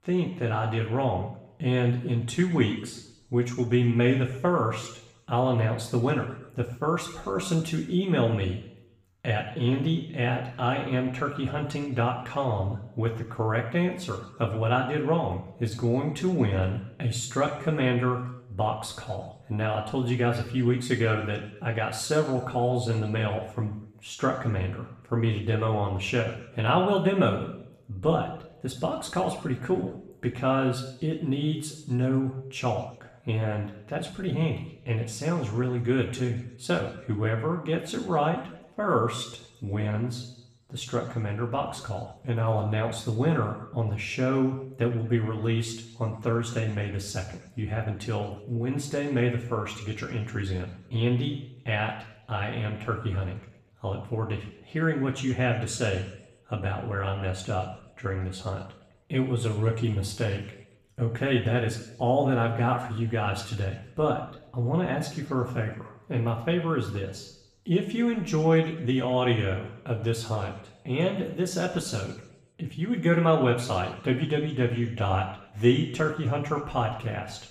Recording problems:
off-mic speech; far
room echo; slight; dies away in 0.8 s

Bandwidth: 15 kHz